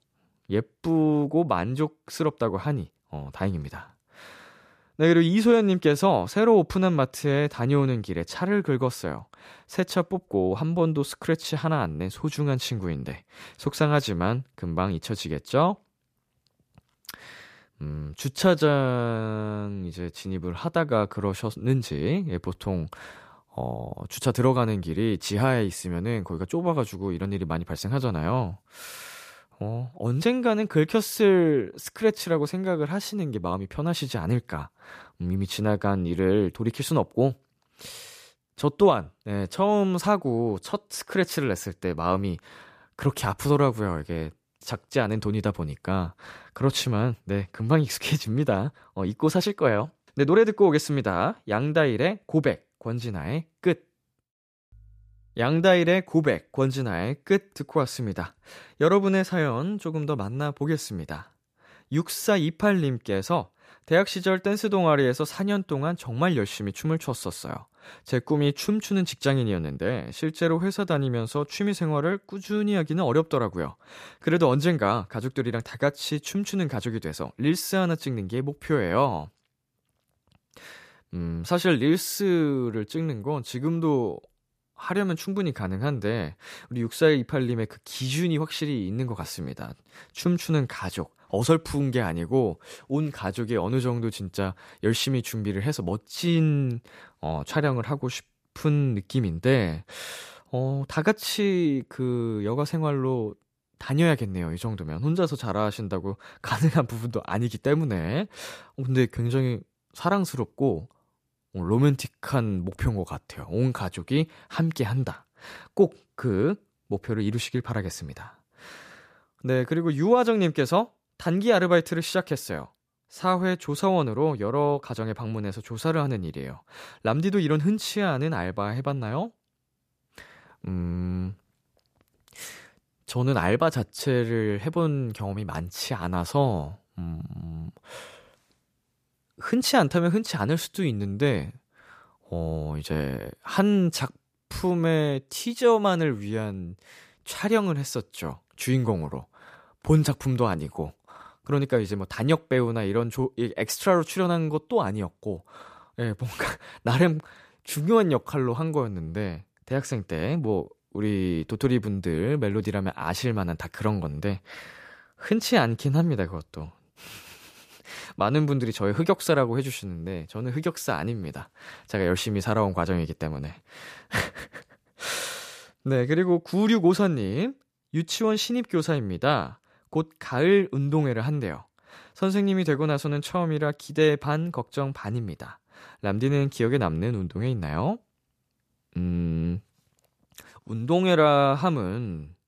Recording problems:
none

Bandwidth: 14.5 kHz